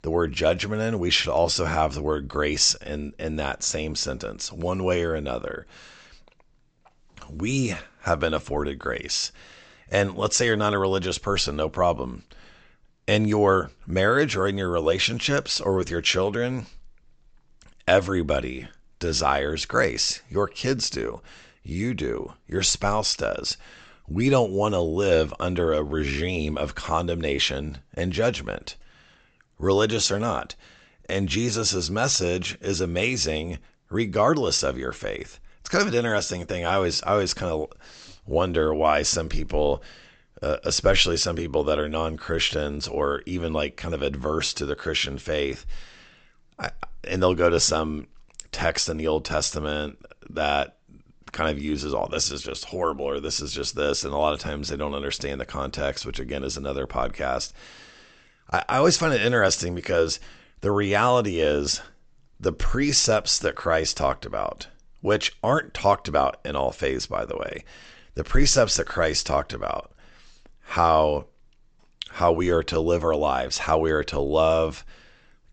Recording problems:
high frequencies cut off; noticeable; nothing above 8 kHz

